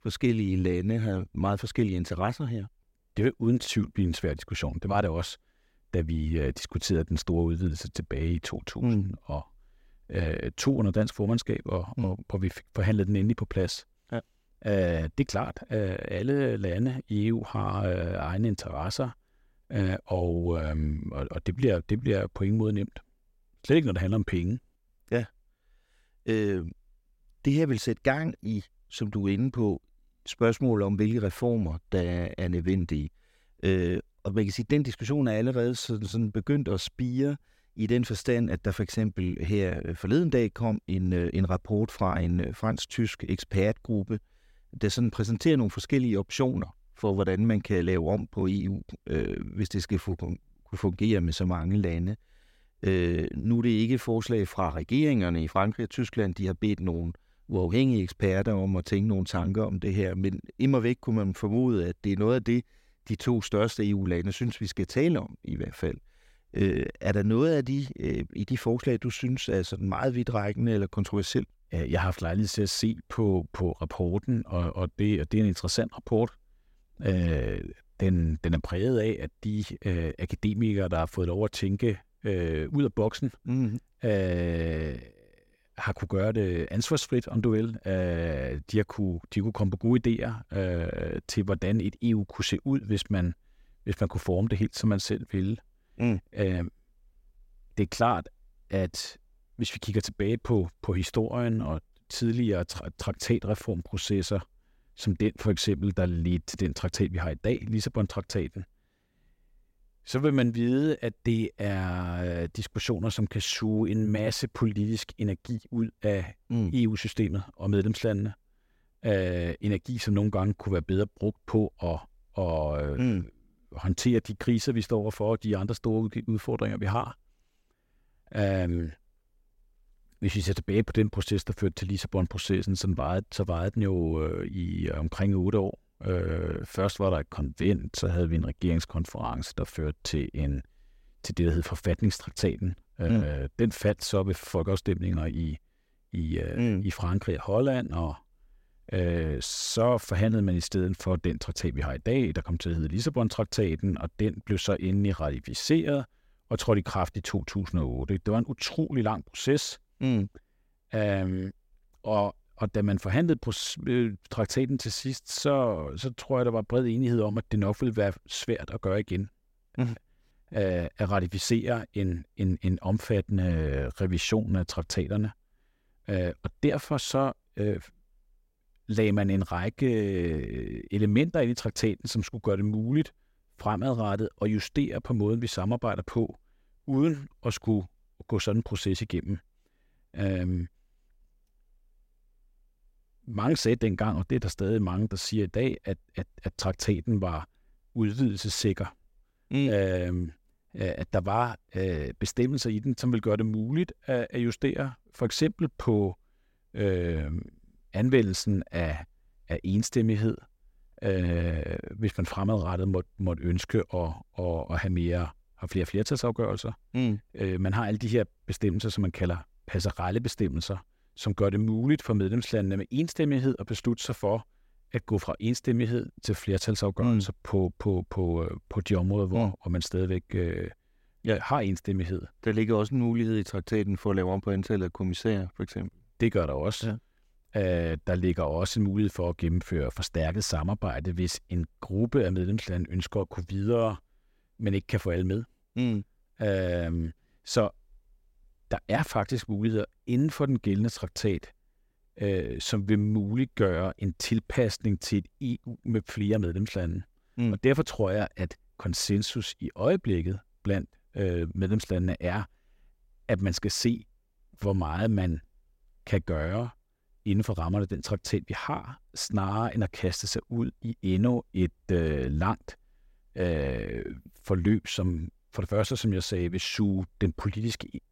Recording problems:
none

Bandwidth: 16 kHz